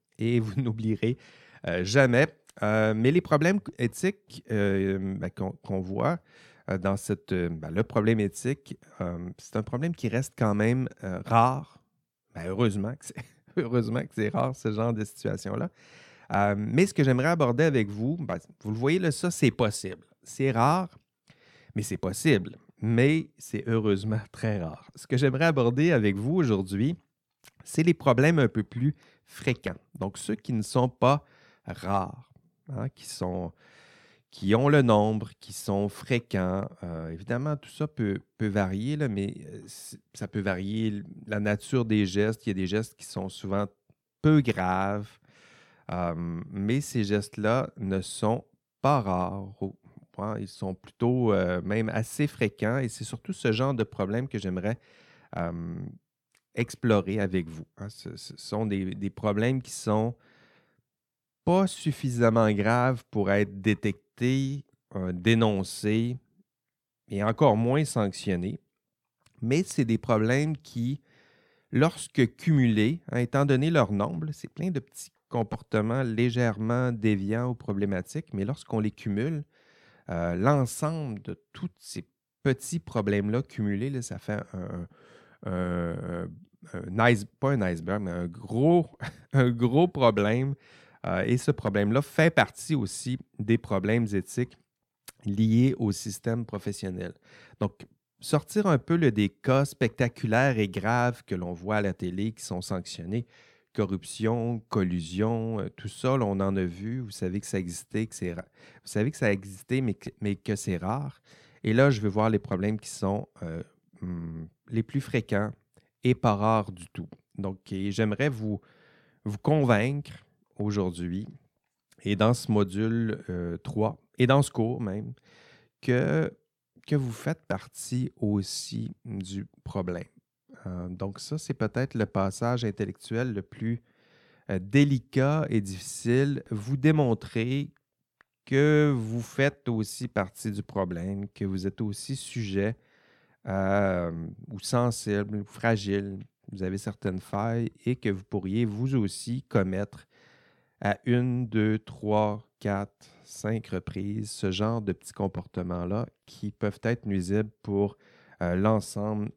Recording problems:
none

